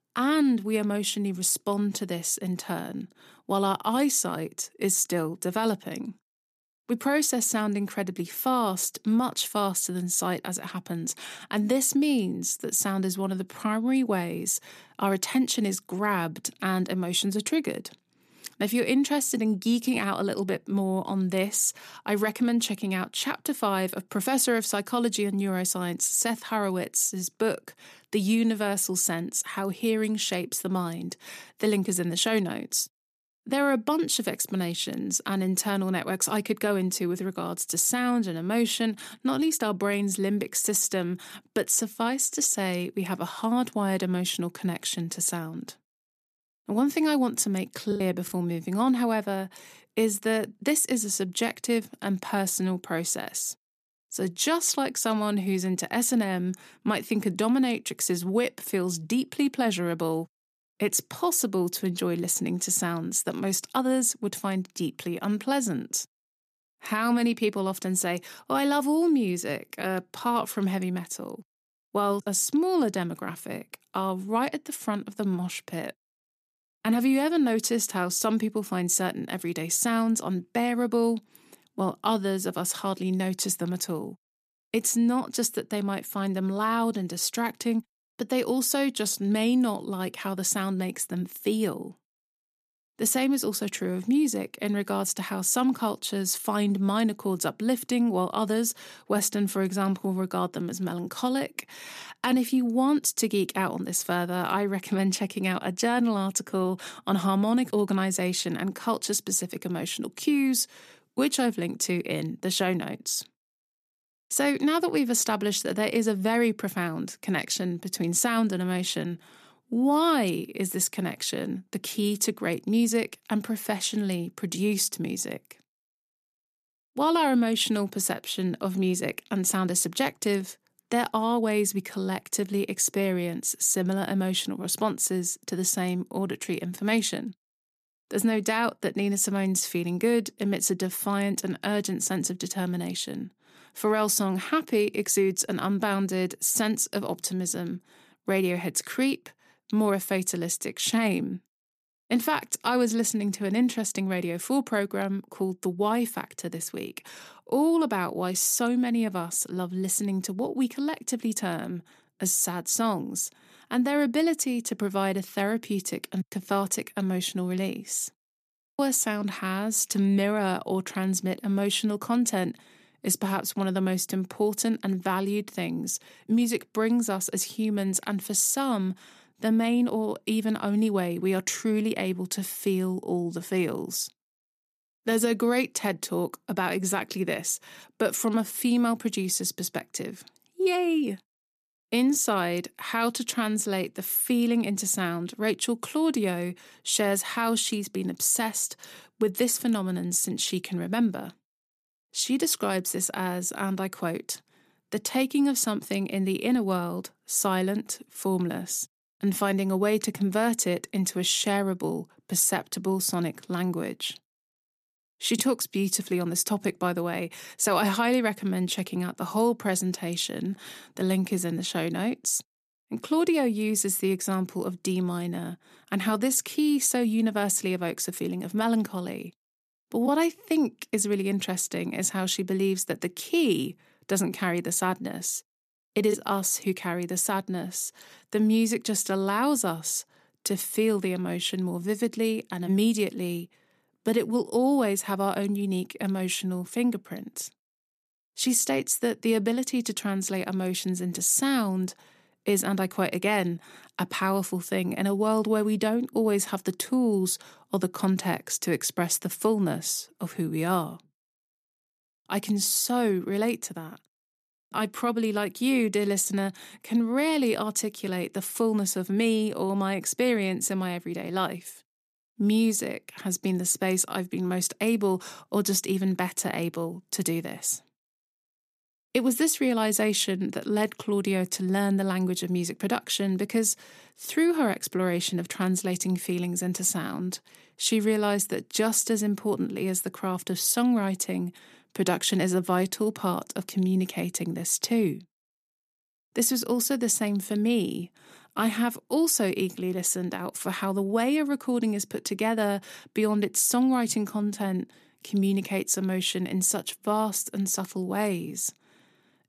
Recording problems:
choppy; very; at 48 s; 7% of the speech affected

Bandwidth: 14.5 kHz